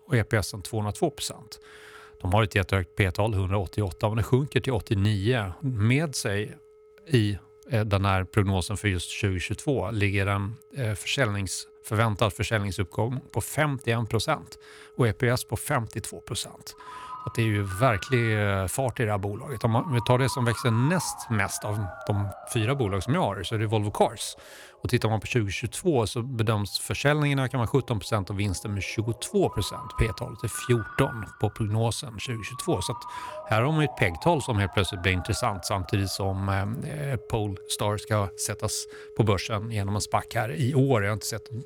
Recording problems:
alarms or sirens; noticeable; throughout; 15 dB below the speech

